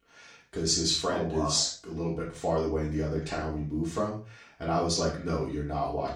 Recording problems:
off-mic speech; far
room echo; noticeable; dies away in 0.3 s

